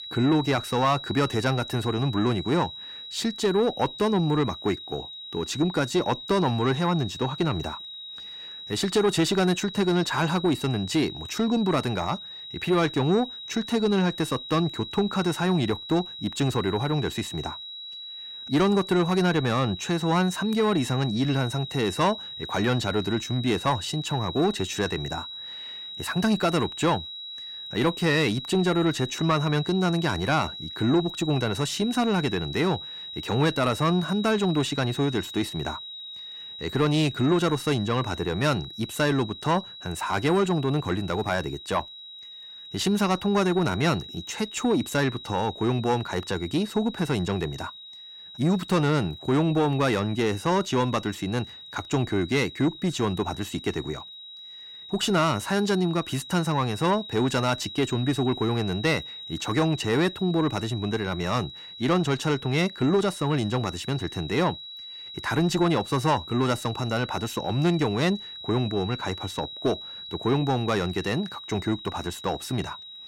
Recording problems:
distortion; slight; 10 dB below the speech
high-pitched whine; noticeable; throughout; 4 kHz, 10 dB below the speech

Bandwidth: 16 kHz